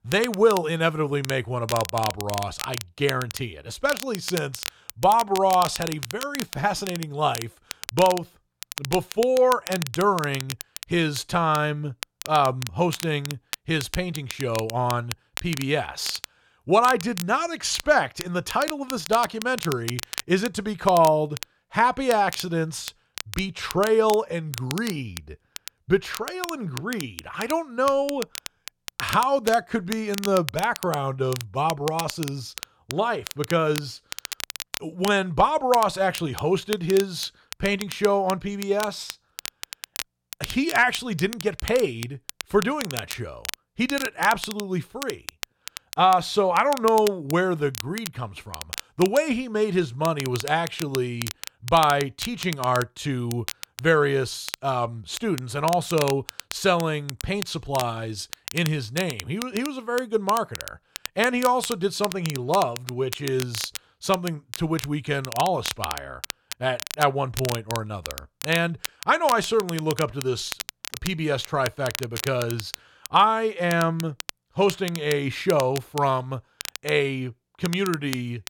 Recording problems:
crackle, like an old record; noticeable; 10 dB below the speech

